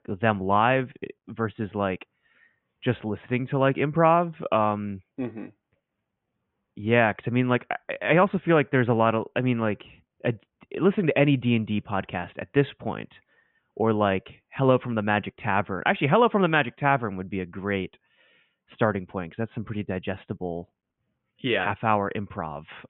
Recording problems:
high frequencies cut off; severe; nothing above 3.5 kHz

